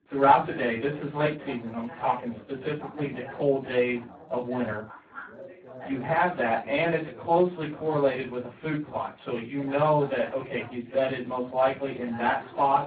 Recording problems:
off-mic speech; far
garbled, watery; badly
muffled; very; fading above 2 kHz
room echo; very slight; dies away in 0.2 s
background chatter; noticeable; throughout; 3 voices, 15 dB below the speech

